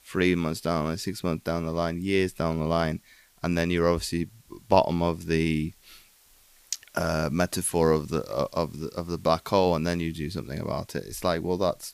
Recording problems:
hiss; faint; throughout; 30 dB below the speech

